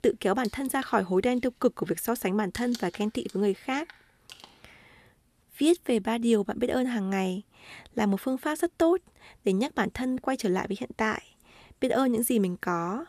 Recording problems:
household noises; noticeable; throughout; 20 dB below the speech

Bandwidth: 14 kHz